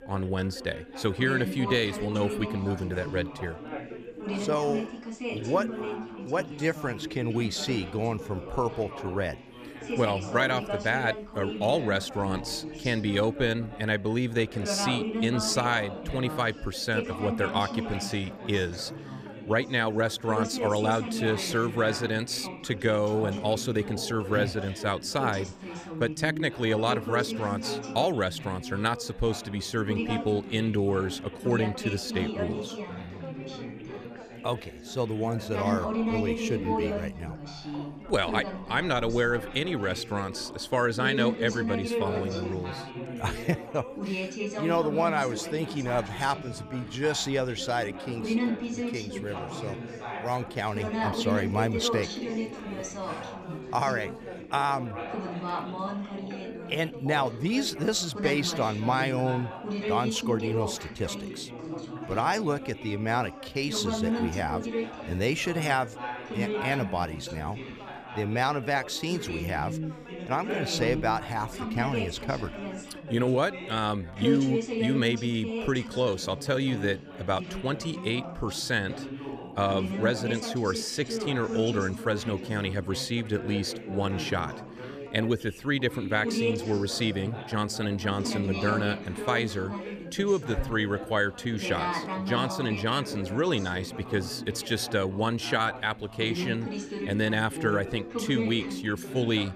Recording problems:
background chatter; loud; throughout; 4 voices, 6 dB below the speech

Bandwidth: 14.5 kHz